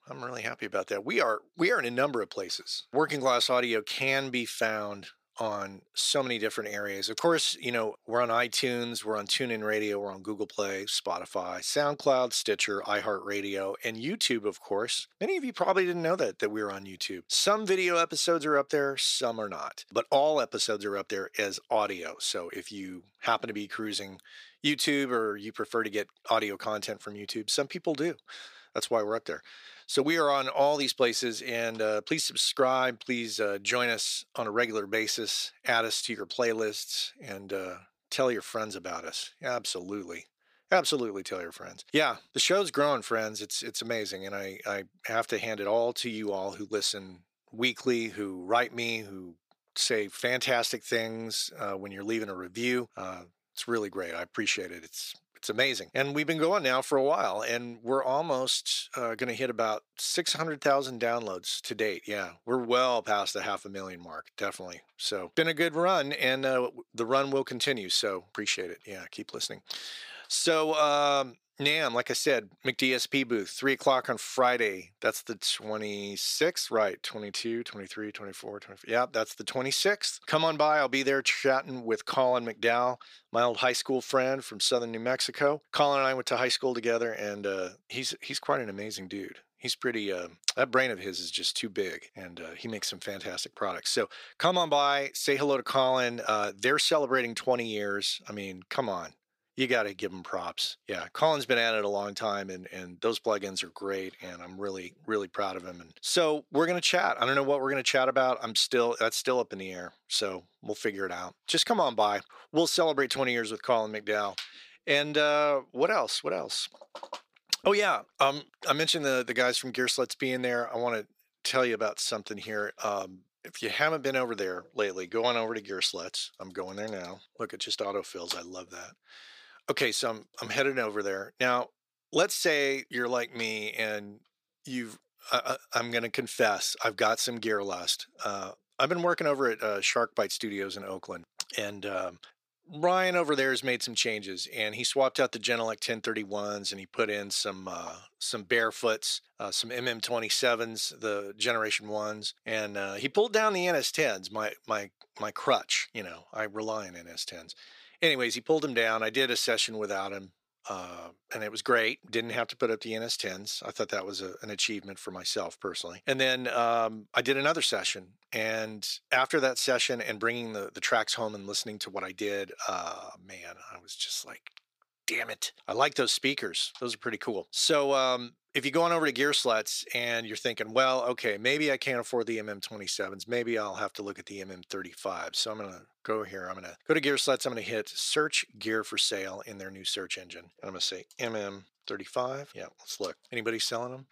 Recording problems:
thin; somewhat; fading below 300 Hz

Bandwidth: 15 kHz